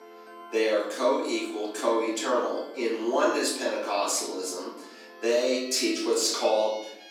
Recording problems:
off-mic speech; far
room echo; noticeable; dies away in 0.8 s
thin; very slightly; fading below 250 Hz
background music; noticeable; throughout; 20 dB below the speech

